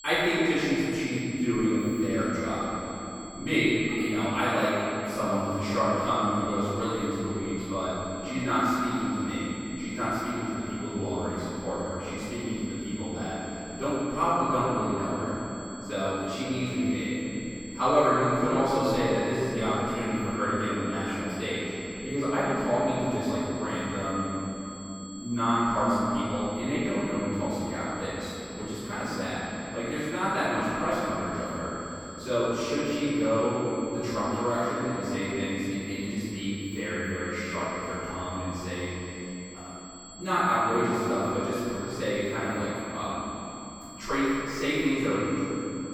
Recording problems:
room echo; strong; dies away in 3 s
off-mic speech; far
high-pitched whine; noticeable; throughout; 7.5 kHz, 15 dB below the speech

